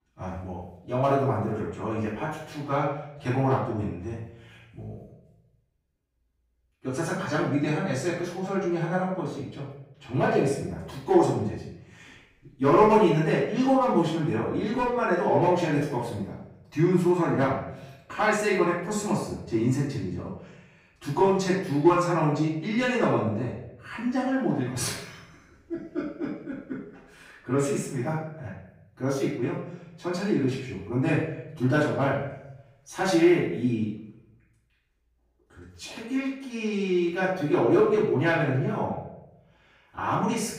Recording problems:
off-mic speech; far
room echo; noticeable; dies away in 0.7 s

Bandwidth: 15.5 kHz